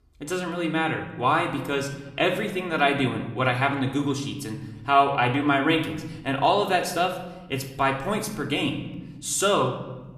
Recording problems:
room echo; slight; dies away in 1 s
off-mic speech; somewhat distant

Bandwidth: 14.5 kHz